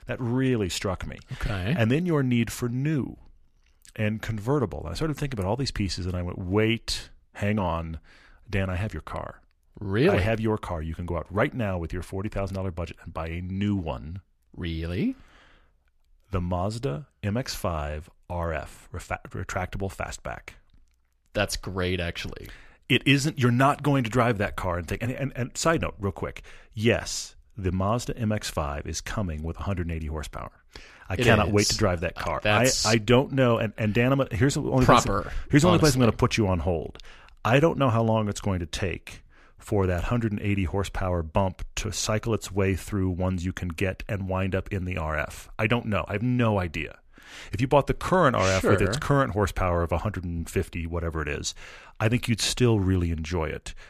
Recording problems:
none

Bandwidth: 14.5 kHz